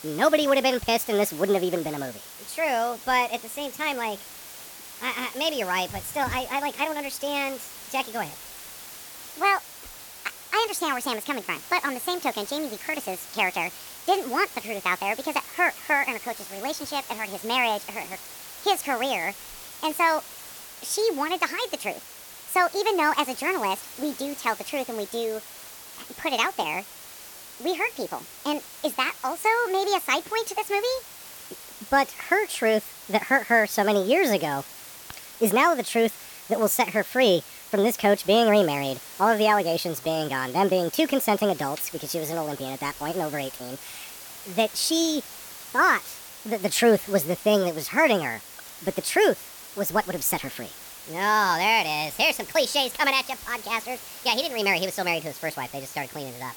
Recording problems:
wrong speed and pitch; too fast and too high; 1.5 times normal speed
hiss; noticeable; throughout; 15 dB below the speech

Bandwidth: 18.5 kHz